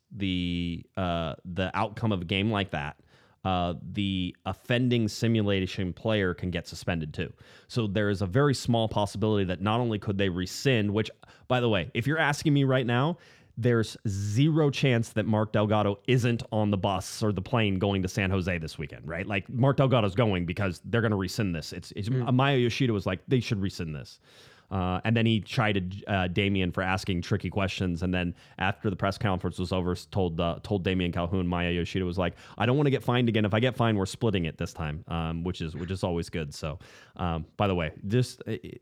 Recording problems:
none

